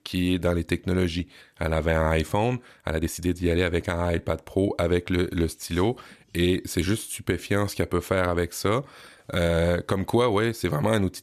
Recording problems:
uneven, jittery; slightly; from 2.5 to 9.5 s

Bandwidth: 14.5 kHz